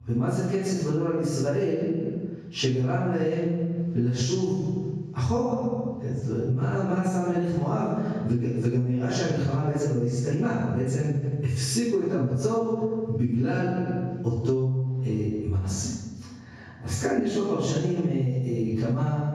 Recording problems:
room echo; strong; dies away in 1.3 s
off-mic speech; far
squashed, flat; heavily

